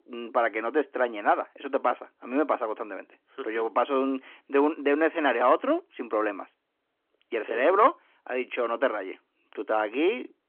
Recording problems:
phone-call audio

